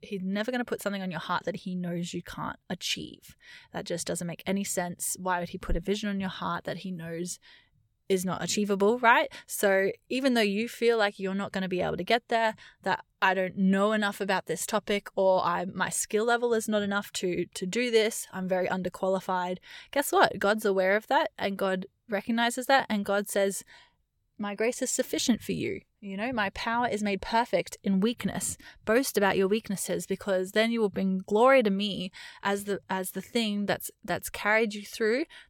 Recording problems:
none

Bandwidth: 17 kHz